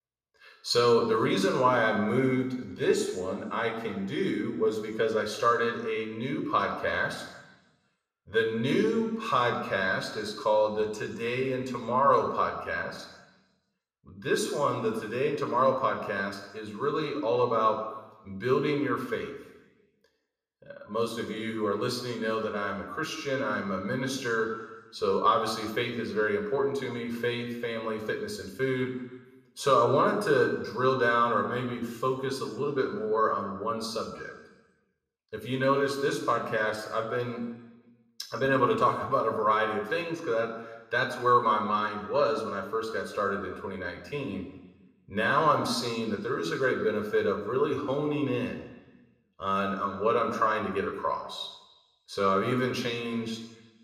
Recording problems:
room echo; slight; dies away in 1 s
off-mic speech; somewhat distant

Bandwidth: 14.5 kHz